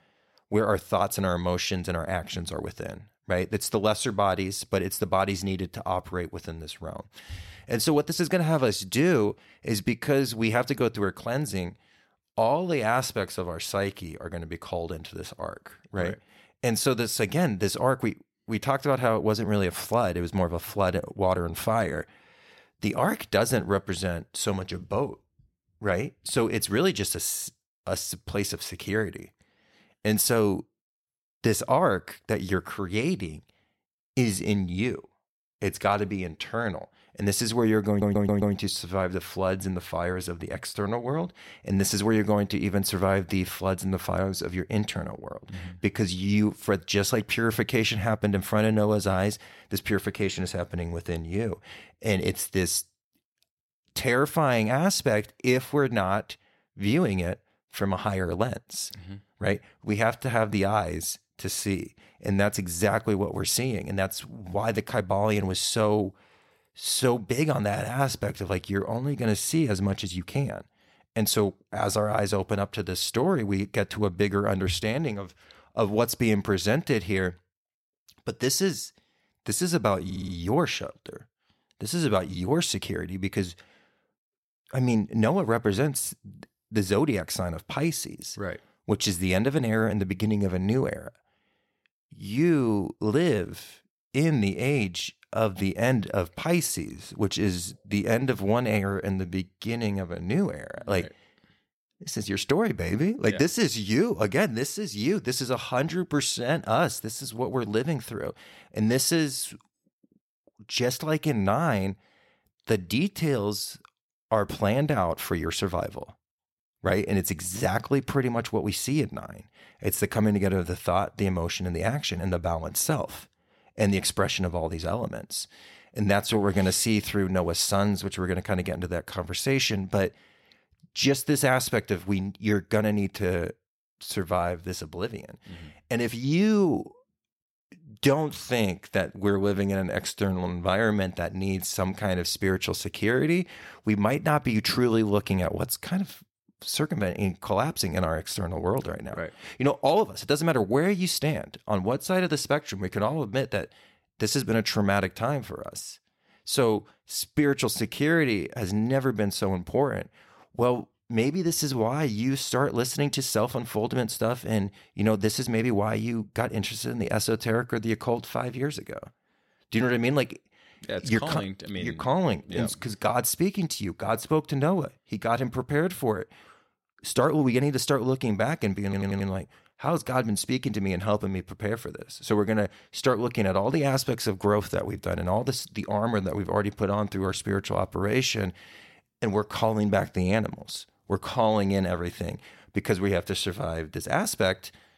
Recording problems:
audio stuttering; at 38 s, at 1:20 and at 2:59

